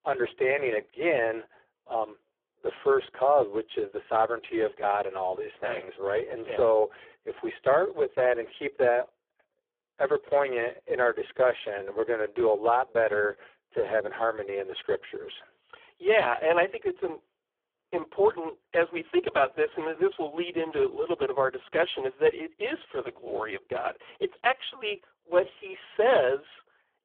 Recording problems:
phone-call audio; poor line

